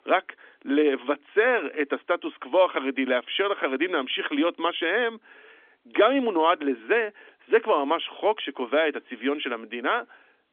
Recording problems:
phone-call audio; nothing above 3.5 kHz

